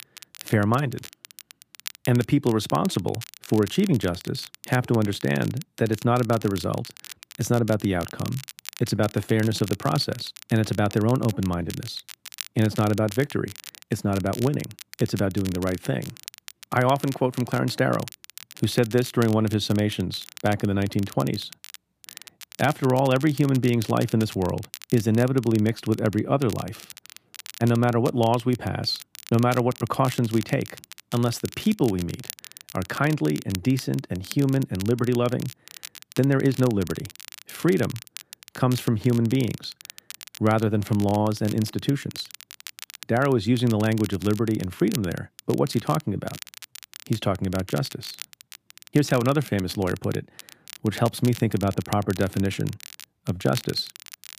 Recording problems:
crackle, like an old record; noticeable; 15 dB below the speech

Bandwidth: 15 kHz